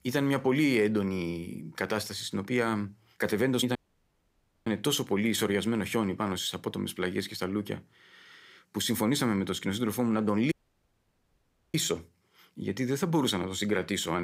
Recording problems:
audio cutting out; at 4 s for 1 s and at 11 s for 1 s
abrupt cut into speech; at the end

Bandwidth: 15.5 kHz